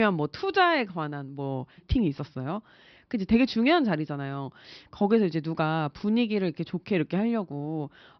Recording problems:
high frequencies cut off; noticeable; nothing above 5.5 kHz
abrupt cut into speech; at the start

